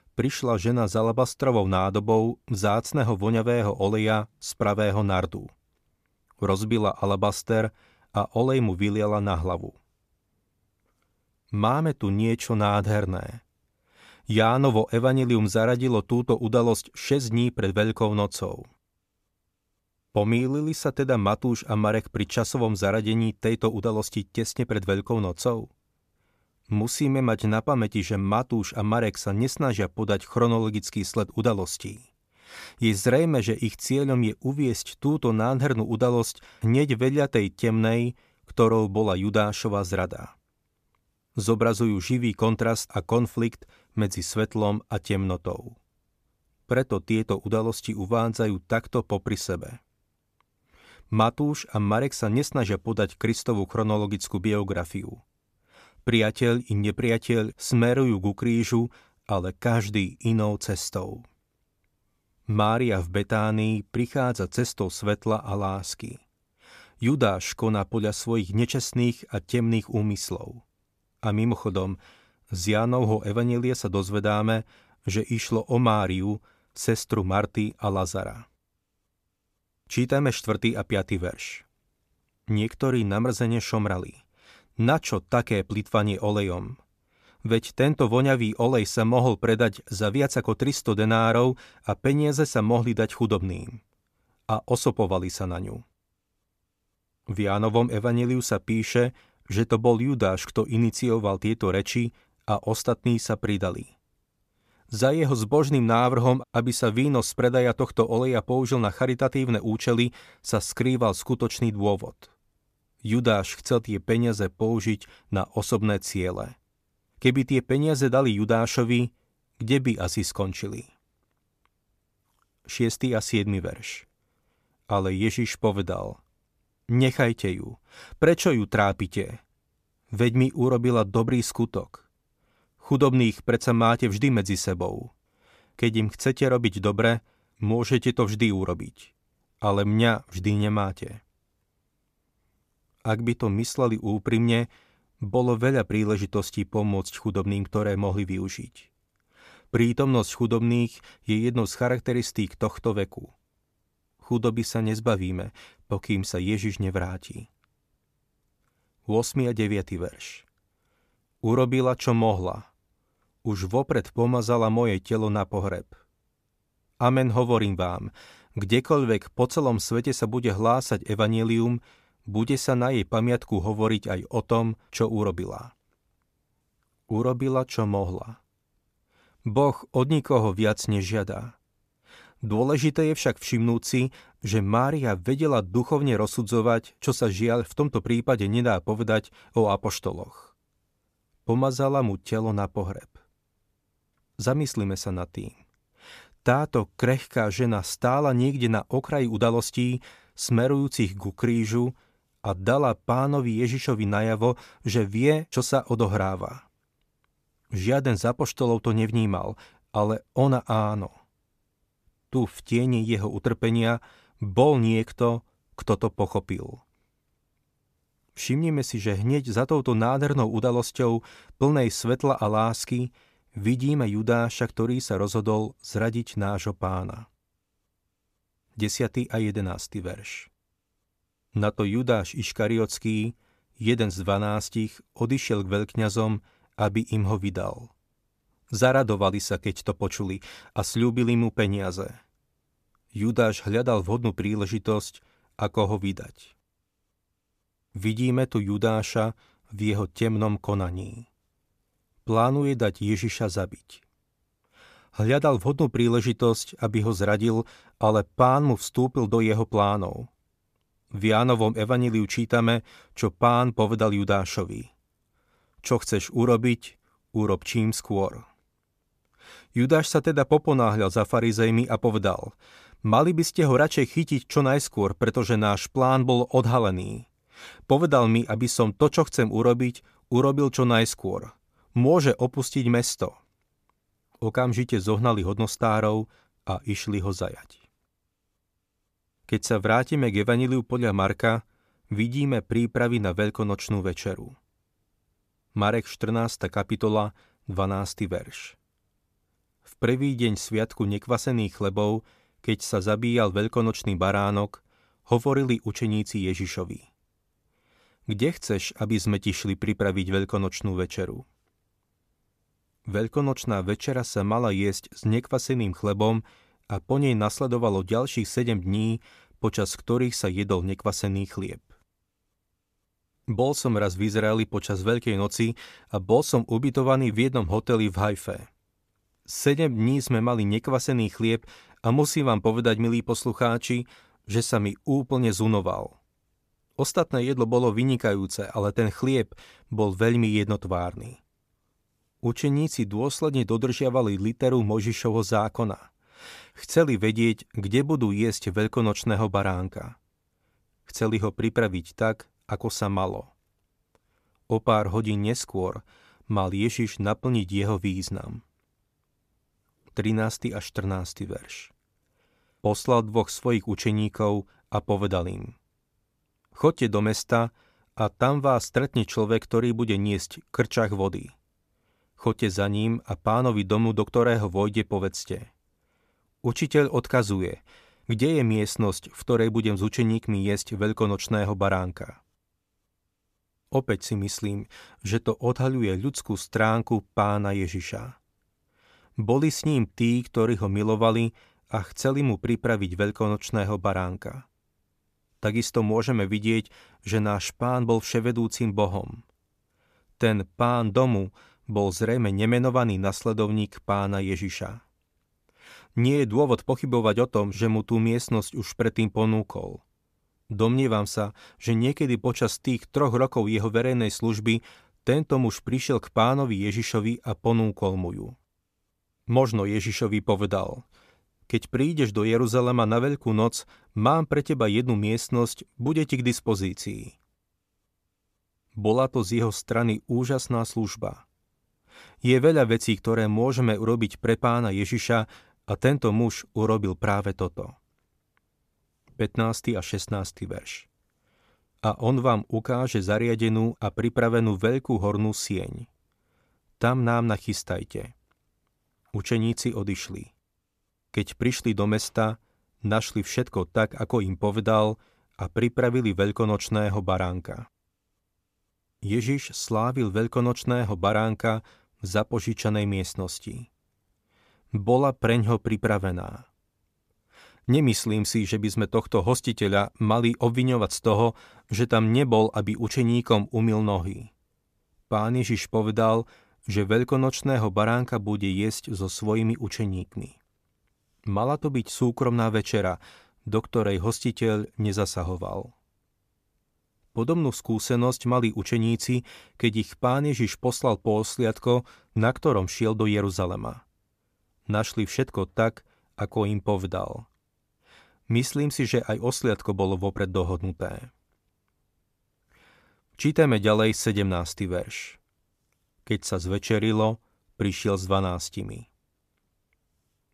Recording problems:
none

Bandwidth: 14.5 kHz